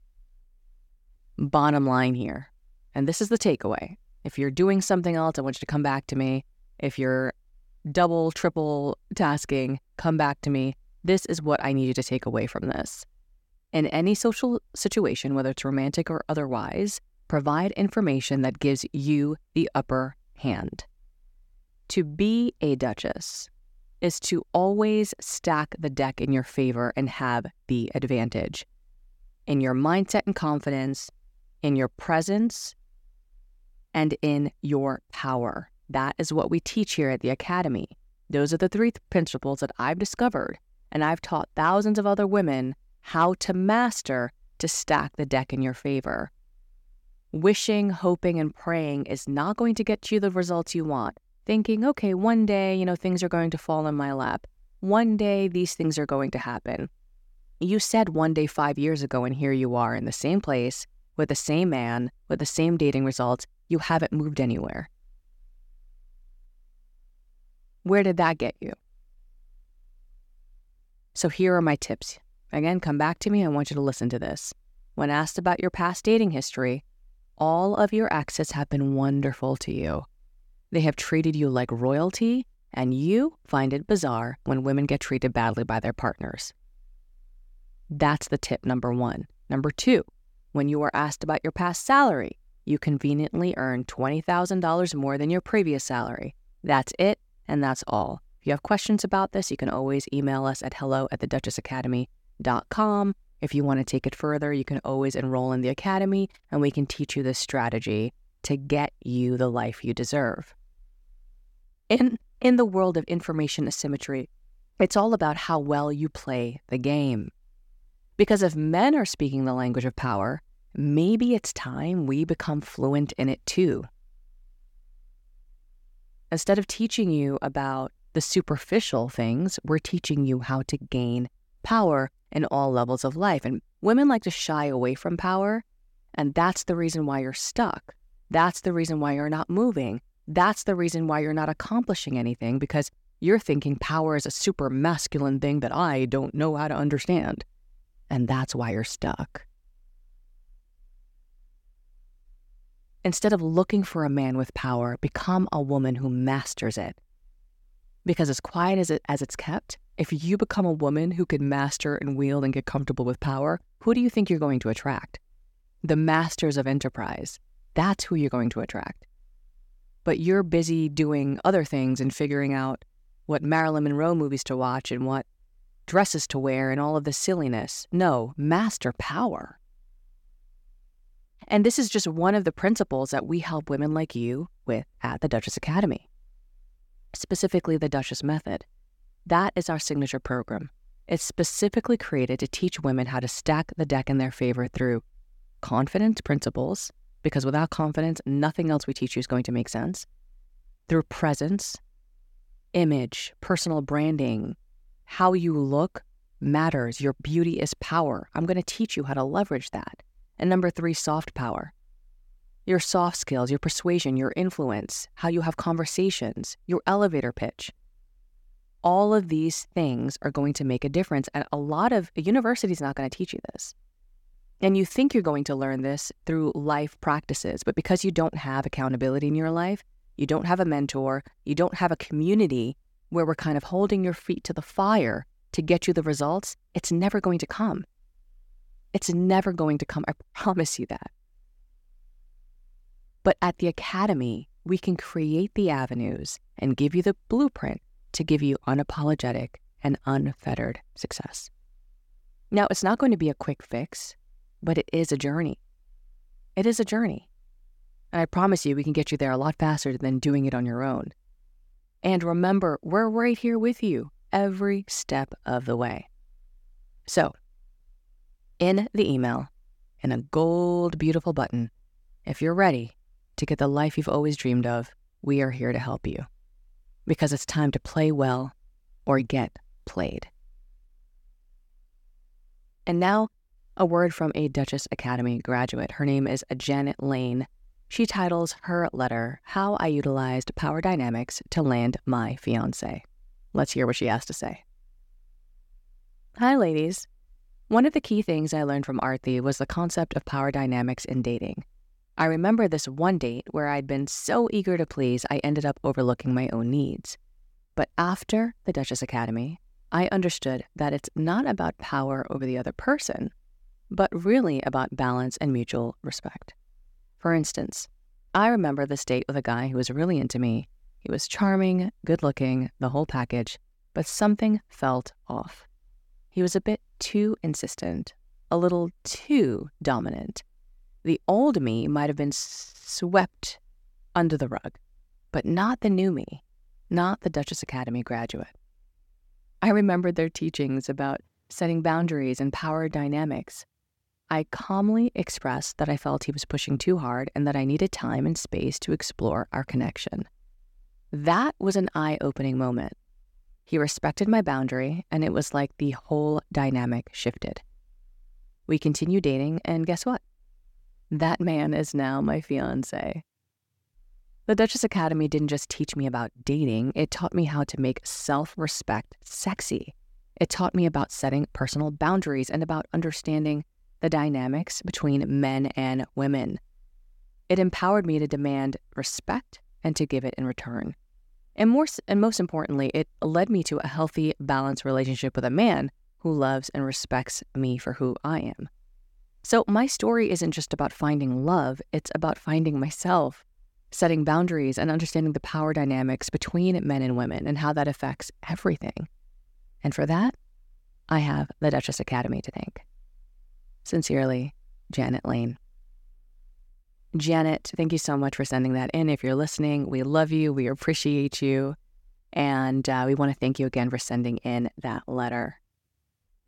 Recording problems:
none

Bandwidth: 17 kHz